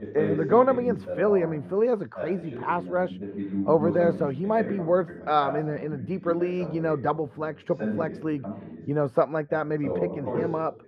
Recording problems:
muffled; very; fading above 2.5 kHz
voice in the background; loud; throughout; 8 dB below the speech

